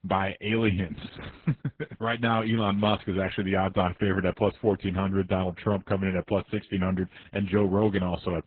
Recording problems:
garbled, watery; badly

